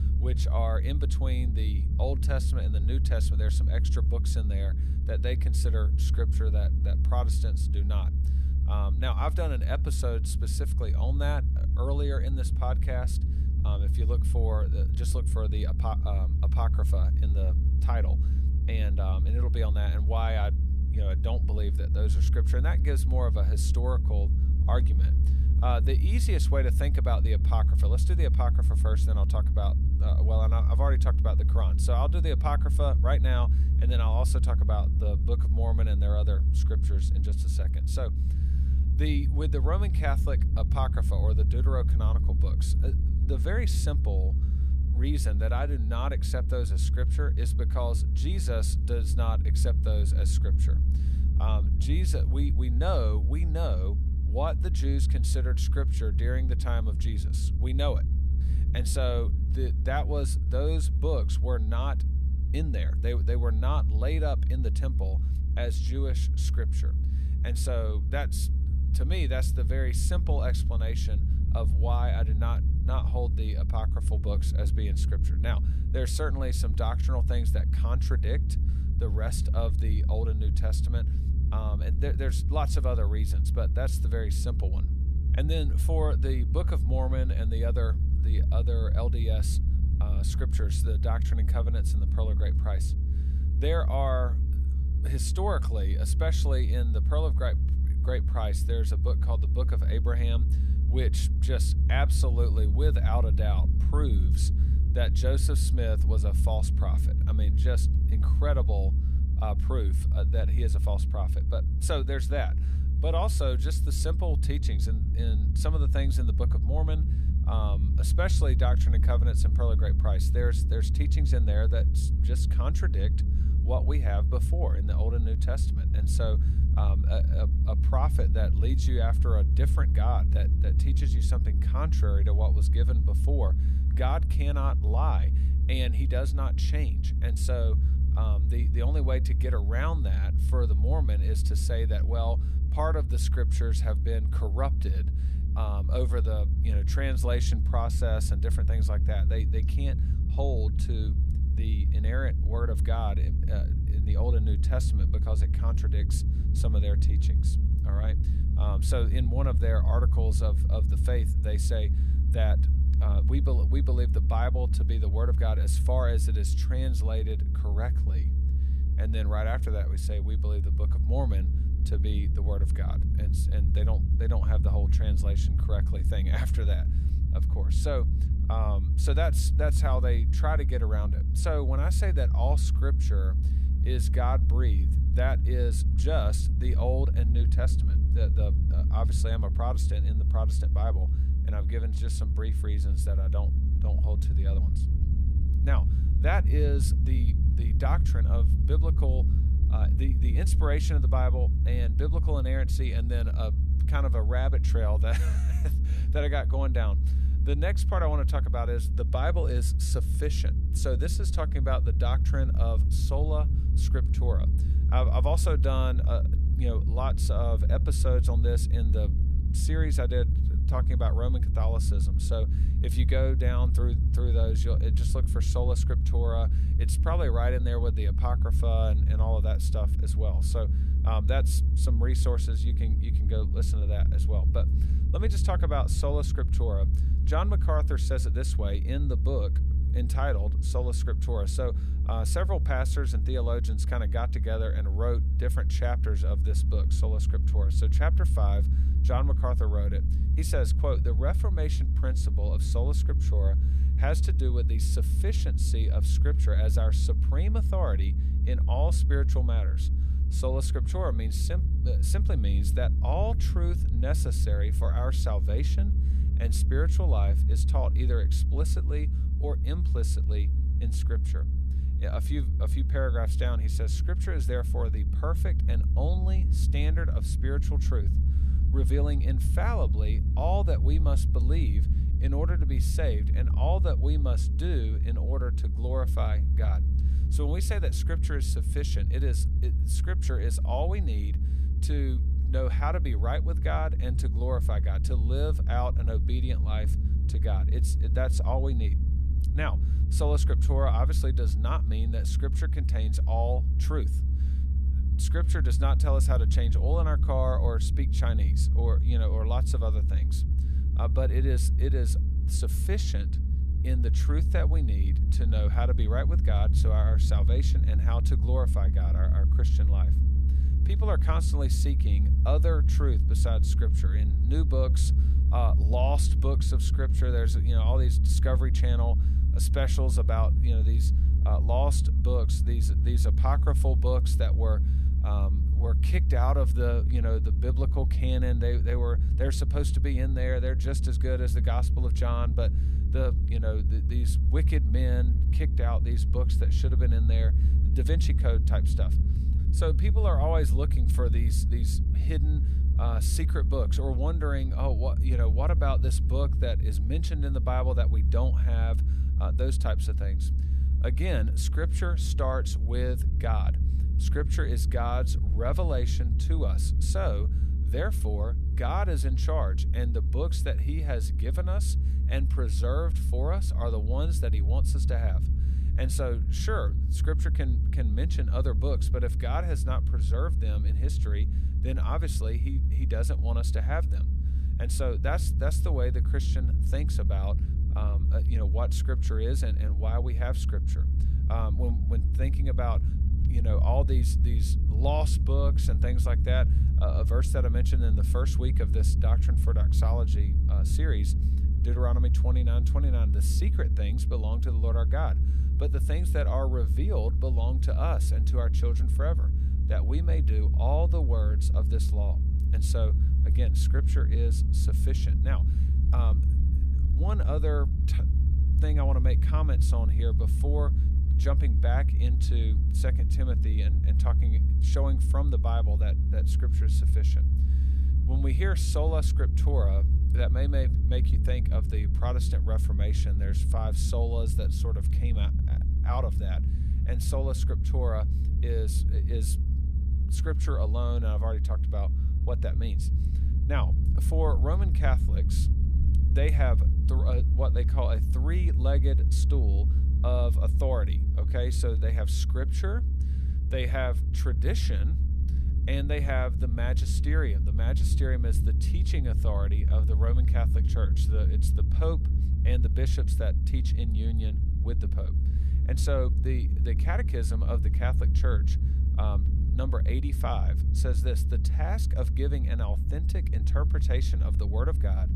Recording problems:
low rumble; loud; throughout; 7 dB below the speech
electrical hum; faint; throughout; 50 Hz, 25 dB below the speech

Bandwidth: 15 kHz